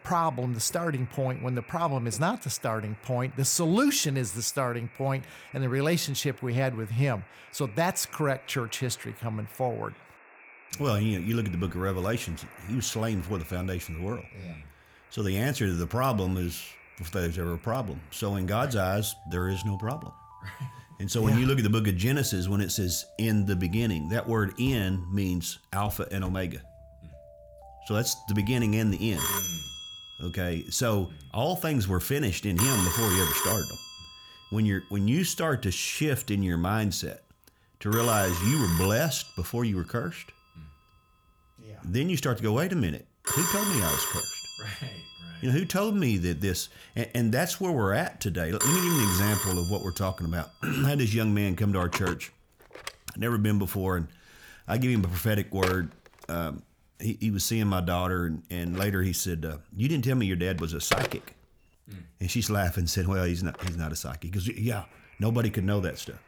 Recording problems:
alarms or sirens; loud; throughout; 3 dB below the speech

